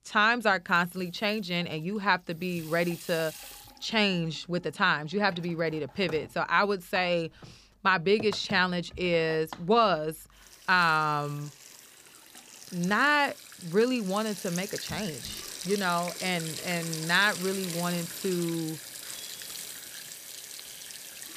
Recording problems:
household noises; noticeable; throughout; 10 dB below the speech

